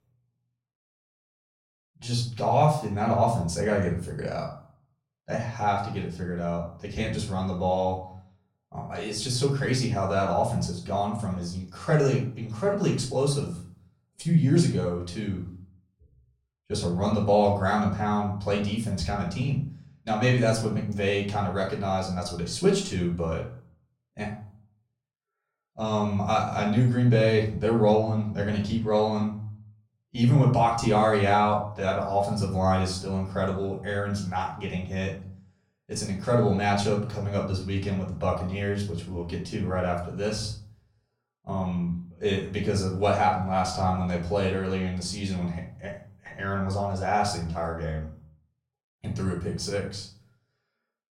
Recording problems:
off-mic speech; far
room echo; slight; dies away in 0.4 s

